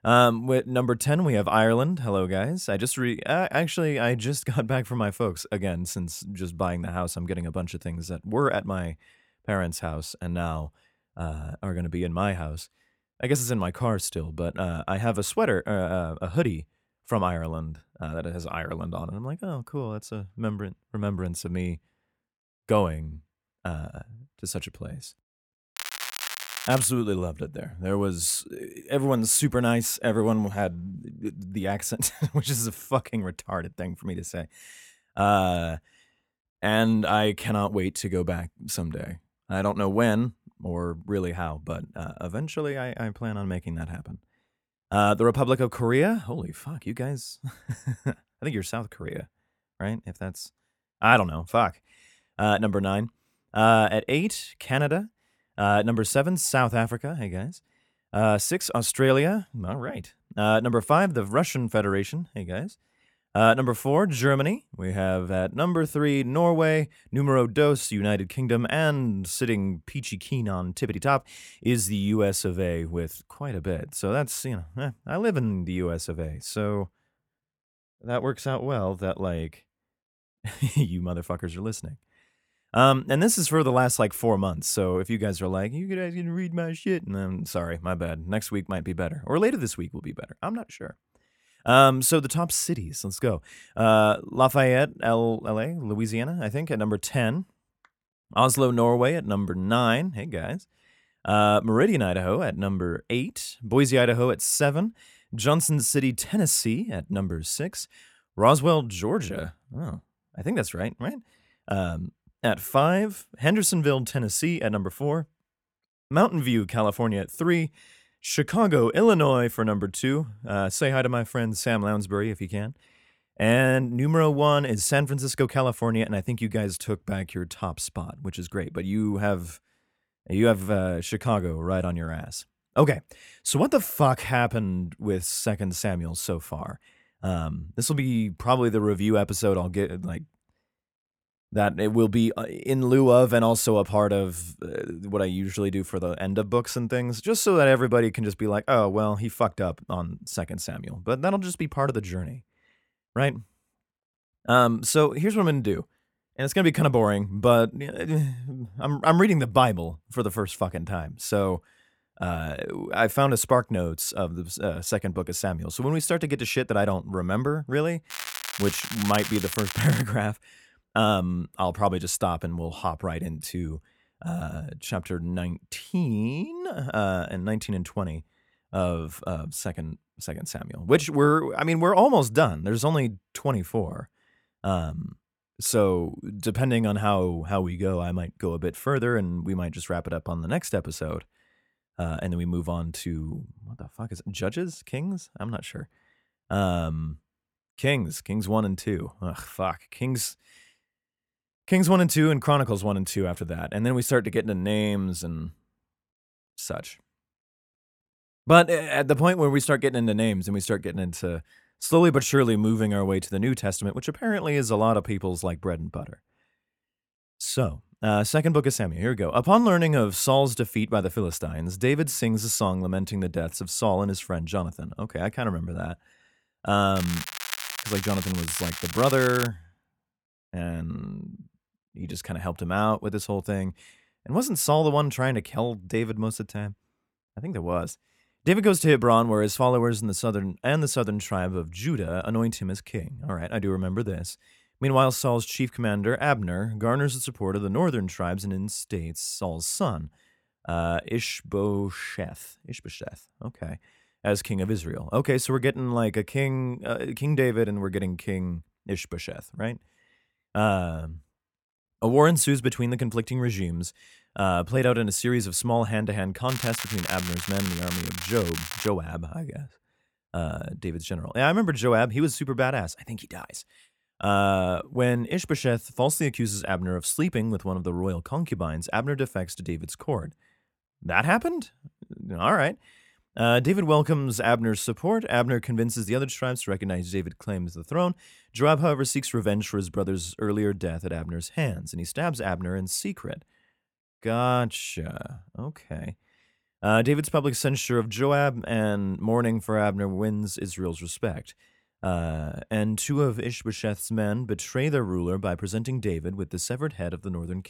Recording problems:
crackling; loud; 4 times, first at 26 s; 7 dB below the speech

